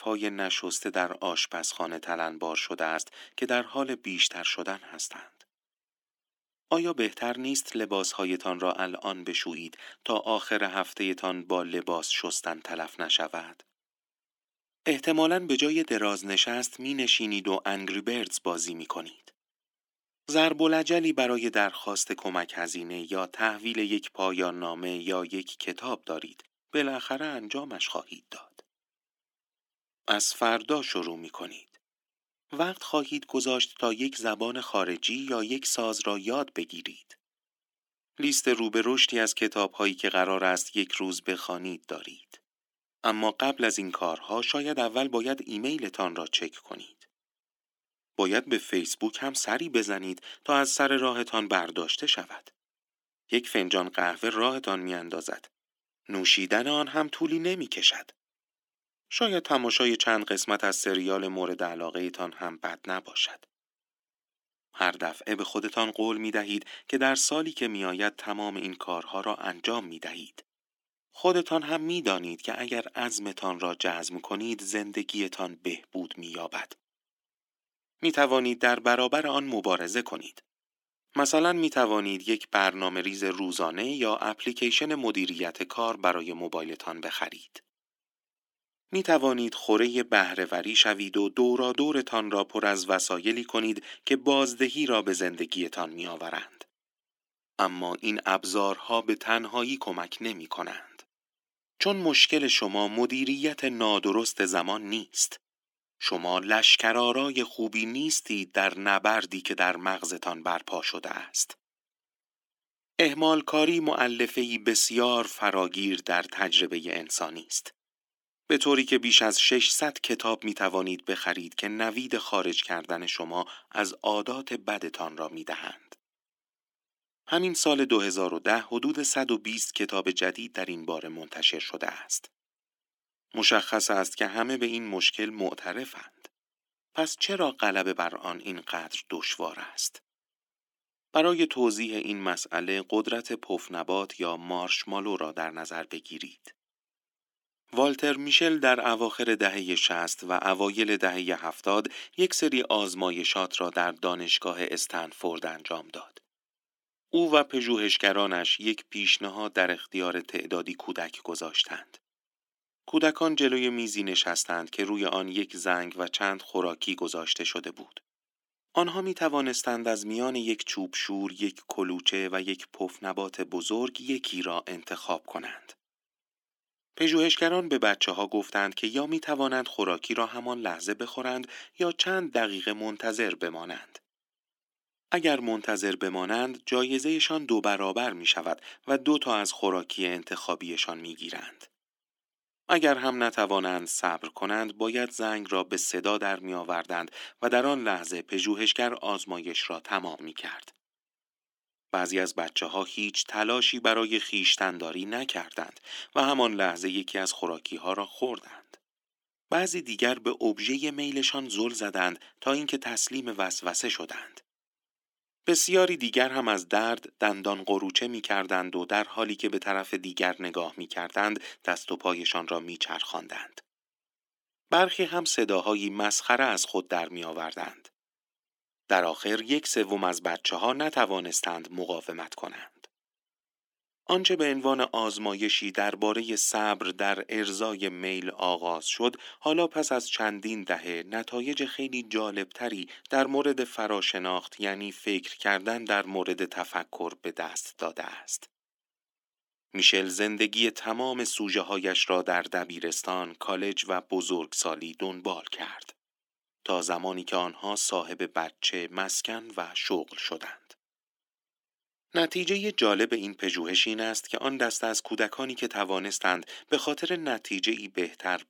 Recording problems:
thin; somewhat; fading below 300 Hz

